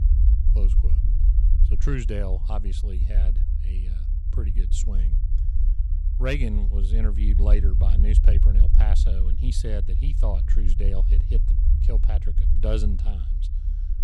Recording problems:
low rumble; loud; throughout; 7 dB below the speech

